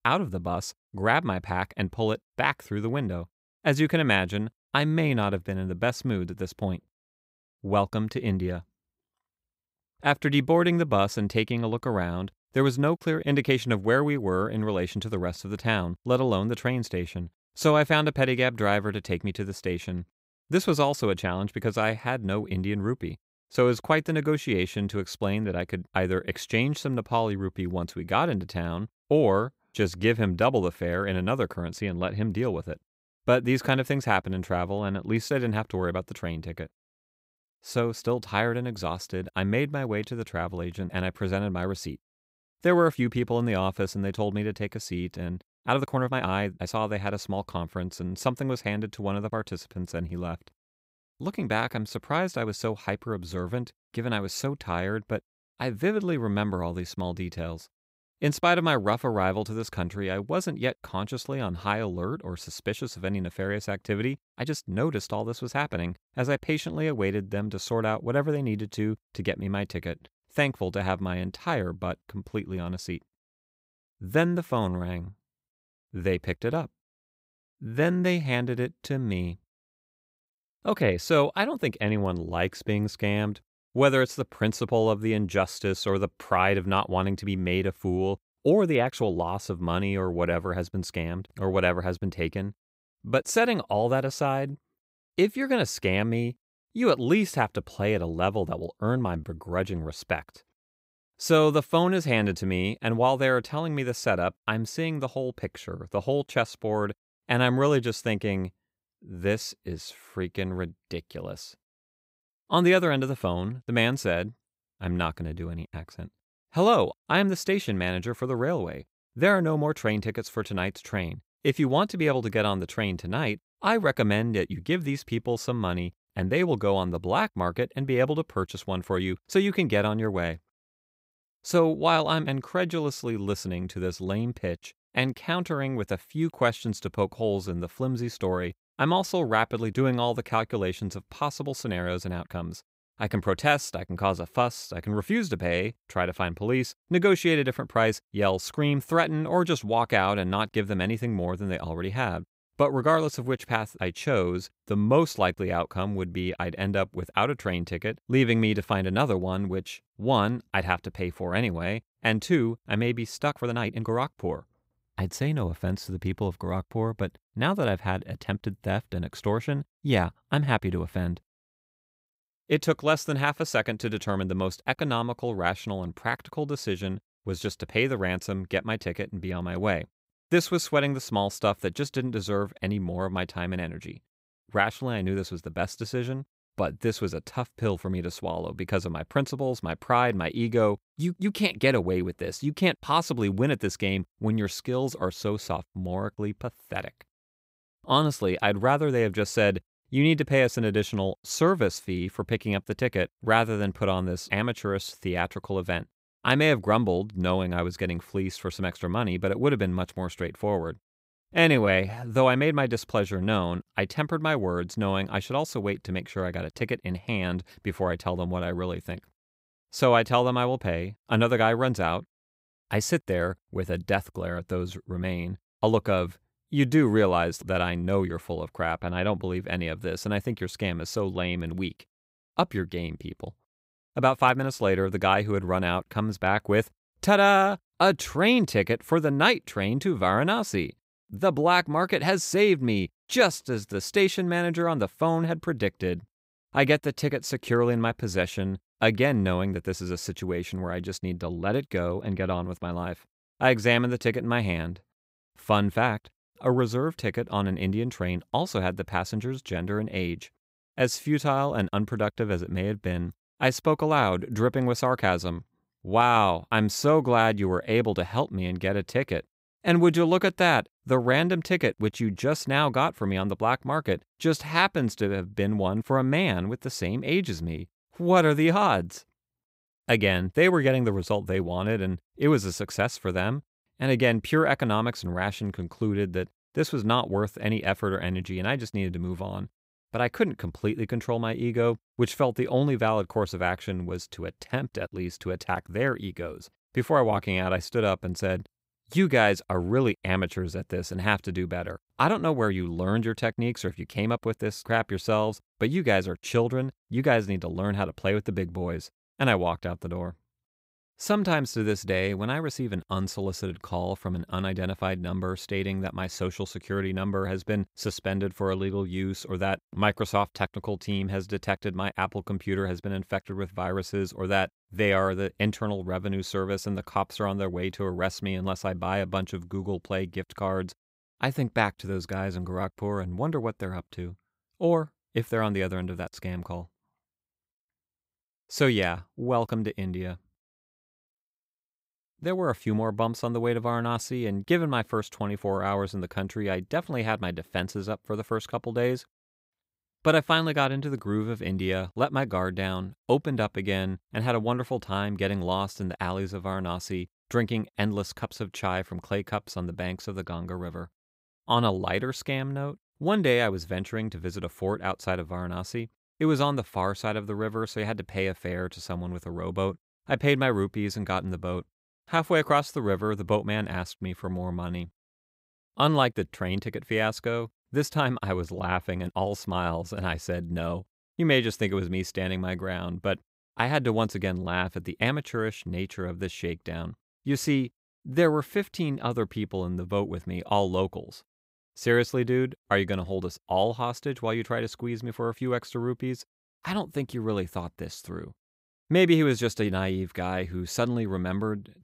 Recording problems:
uneven, jittery; strongly; from 46 s to 6:15

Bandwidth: 15.5 kHz